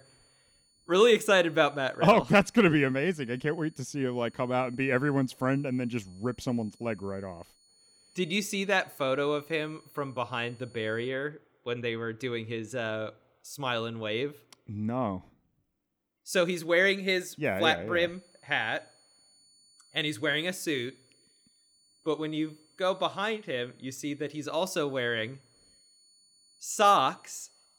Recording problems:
high-pitched whine; faint; until 11 s and from 18 s on; 4.5 kHz, 30 dB below the speech

